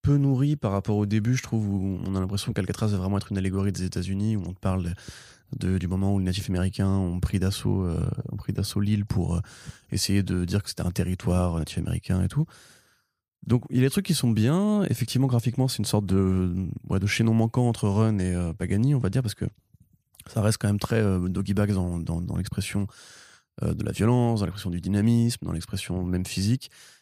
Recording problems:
none

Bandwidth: 15 kHz